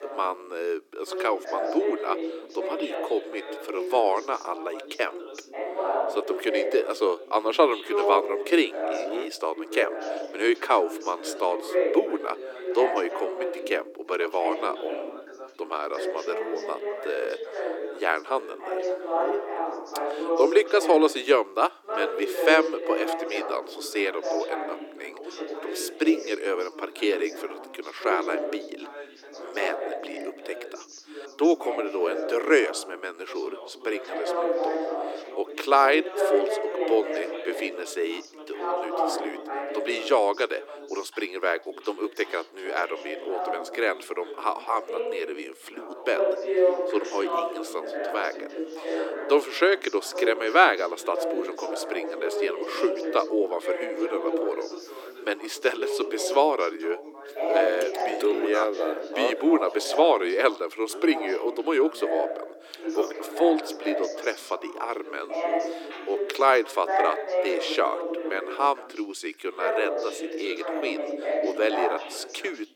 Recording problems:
thin; very; fading below 300 Hz
background chatter; loud; throughout; 2 voices, 4 dB below the speech

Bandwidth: 17 kHz